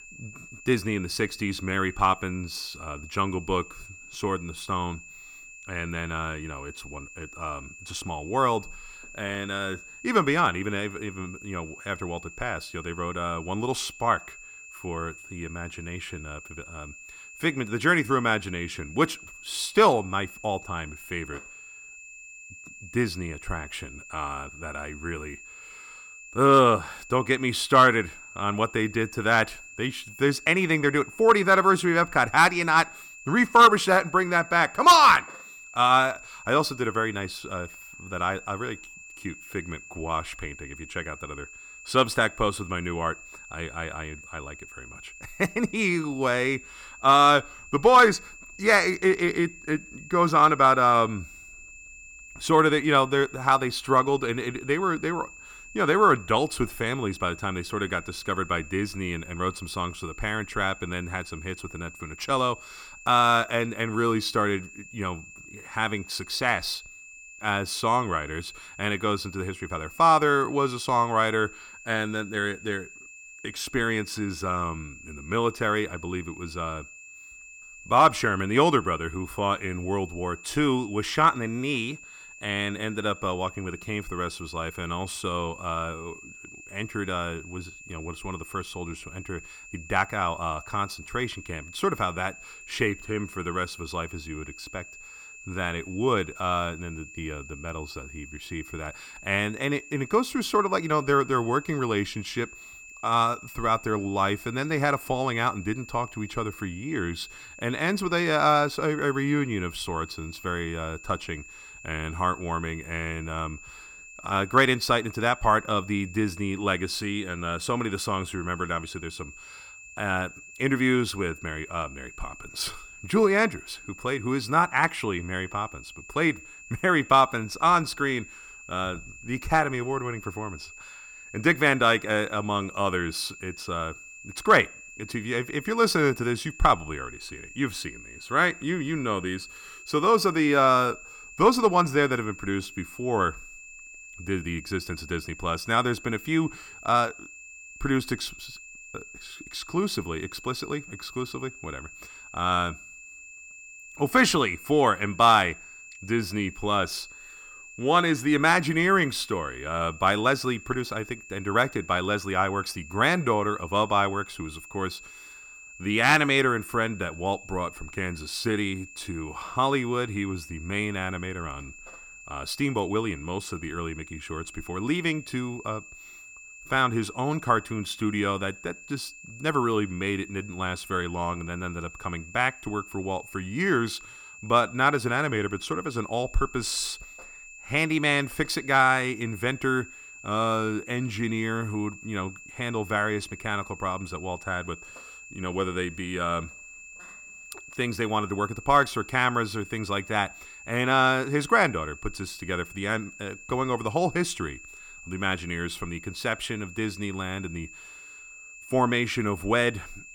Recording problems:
high-pitched whine; noticeable; throughout; 2.5 kHz, 20 dB below the speech

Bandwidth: 17.5 kHz